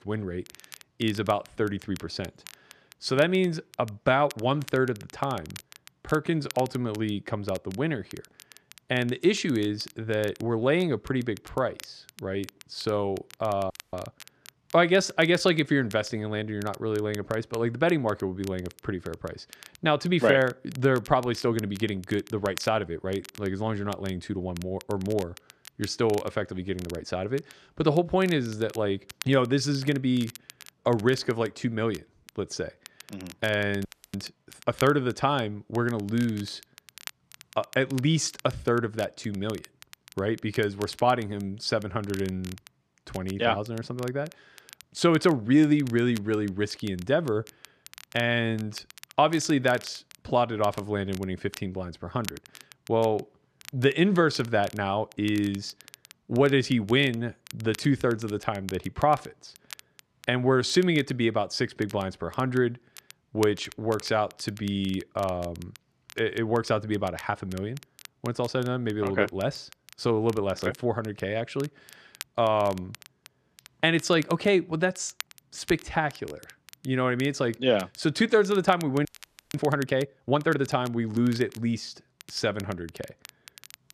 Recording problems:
crackle, like an old record; faint; 20 dB below the speech
audio freezing; at 14 s, at 34 s and at 1:19

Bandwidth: 13.5 kHz